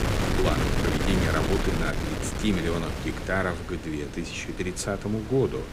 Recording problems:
wind noise on the microphone; heavy; 2 dB below the speech

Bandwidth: 15.5 kHz